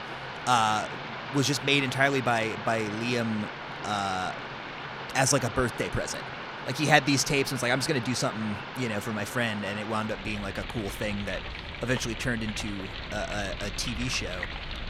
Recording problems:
rain or running water; loud; throughout; 8 dB below the speech

